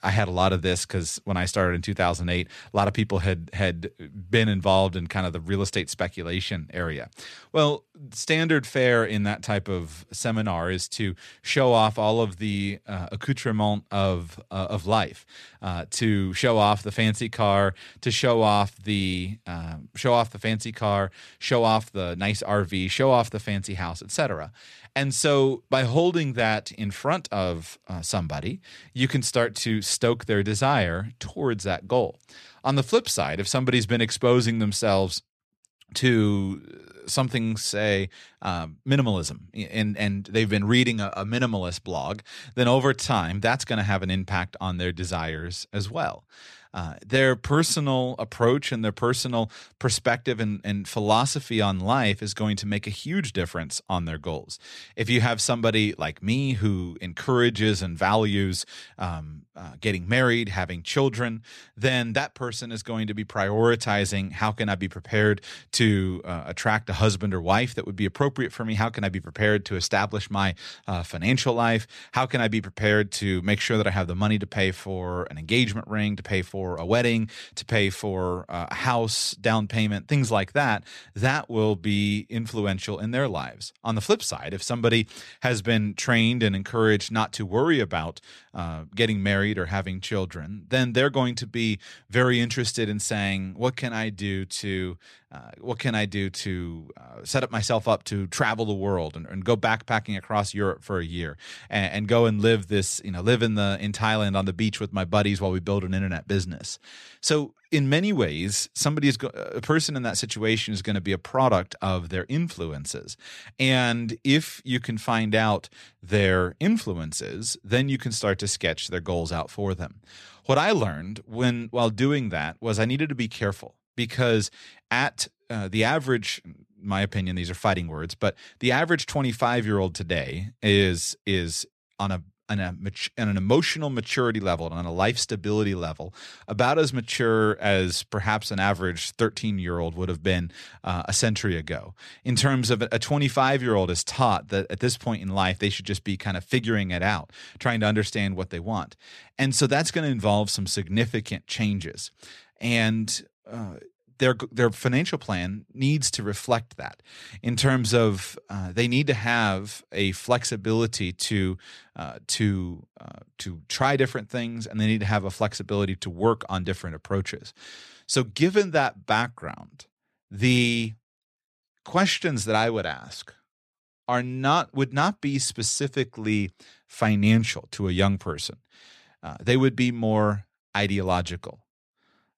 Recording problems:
none

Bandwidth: 13.5 kHz